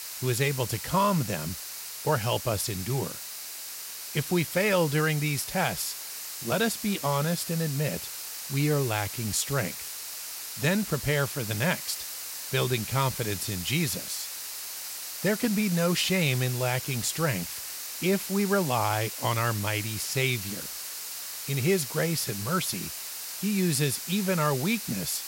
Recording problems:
hiss; loud; throughout; 6 dB below the speech

